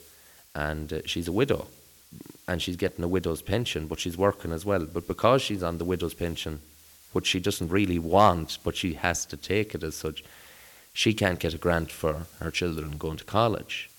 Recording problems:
hiss; faint; throughout; 25 dB below the speech

